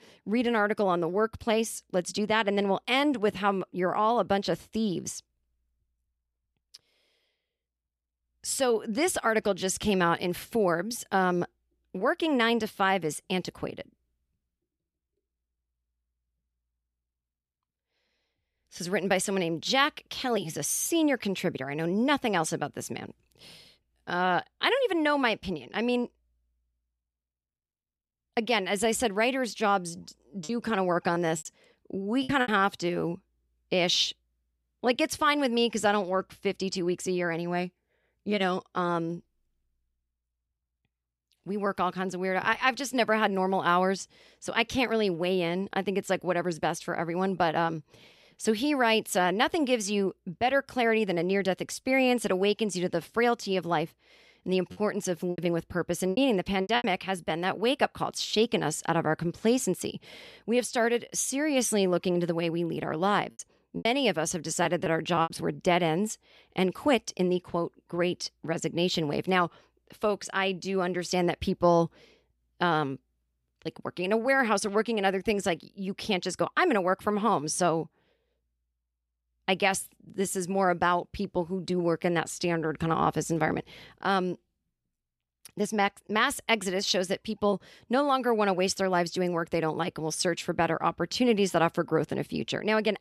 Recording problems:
choppy; very; from 30 to 32 s, from 53 to 57 s and from 1:03 to 1:05; 12% of the speech affected

